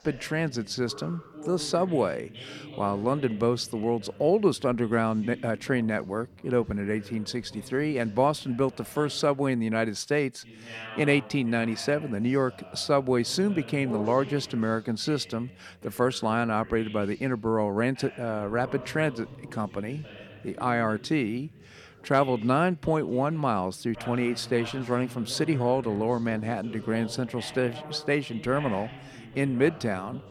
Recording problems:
voice in the background; noticeable; throughout; 15 dB below the speech

